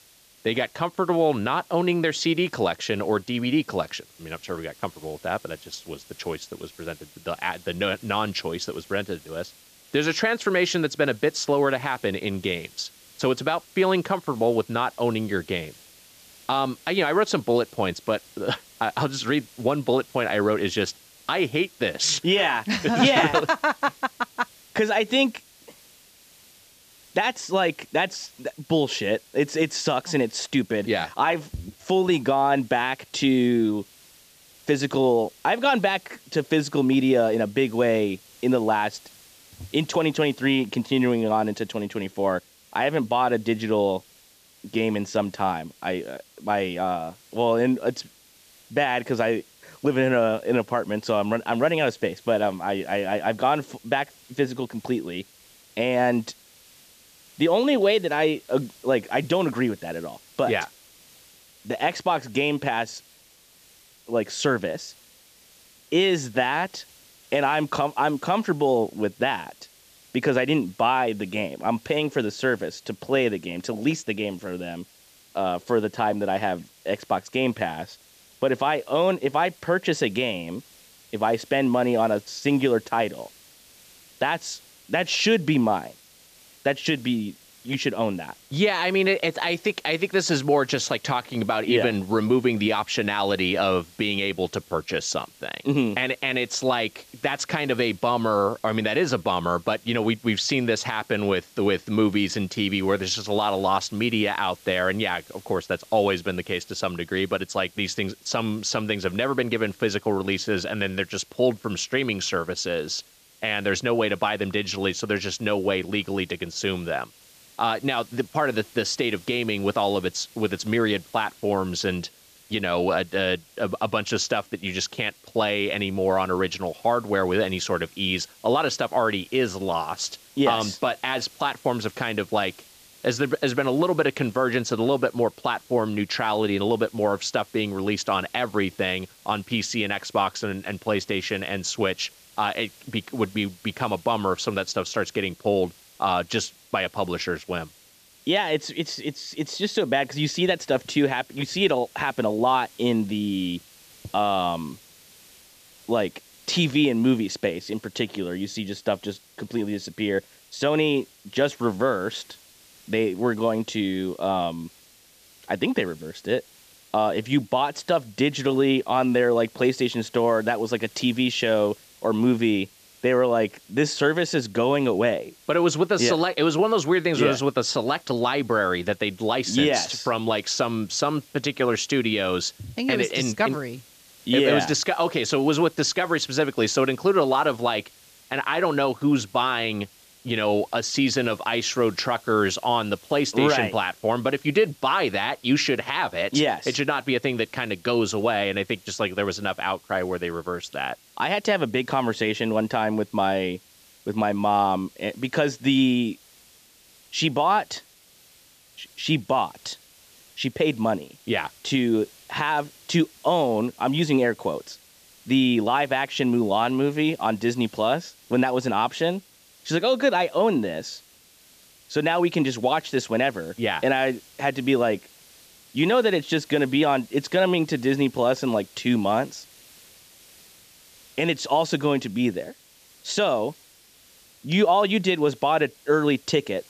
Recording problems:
high frequencies cut off; noticeable; nothing above 8 kHz
hiss; faint; throughout; 25 dB below the speech

